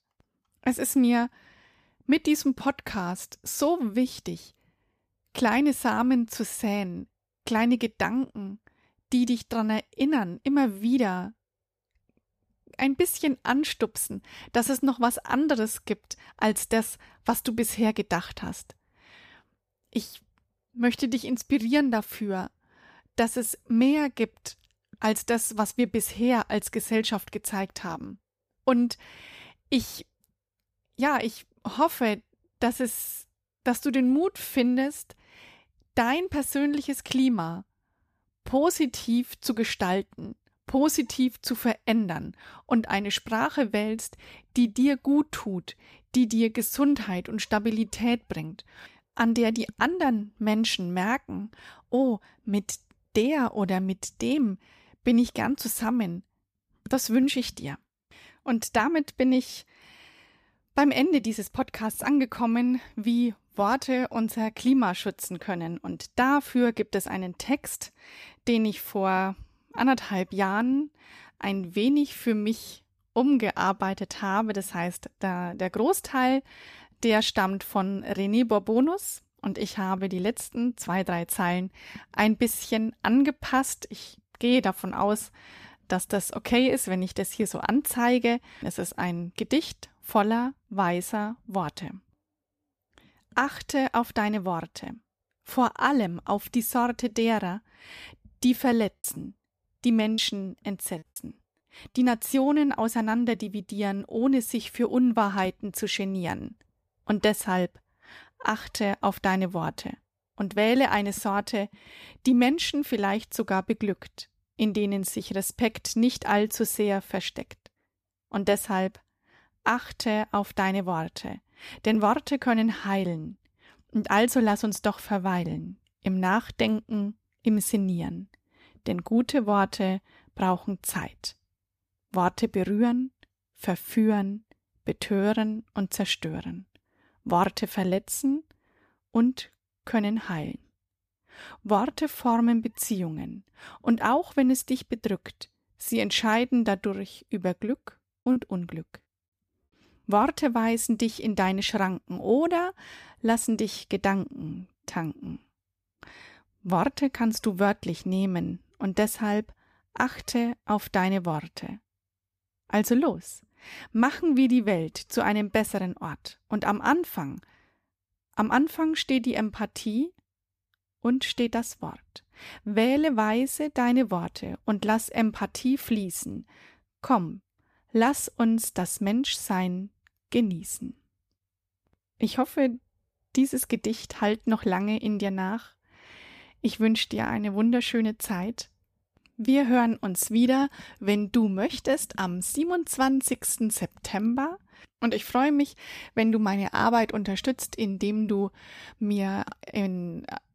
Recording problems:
choppy; very; from 1:39 to 1:41 and at 2:28; 7% of the speech affected

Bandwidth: 14.5 kHz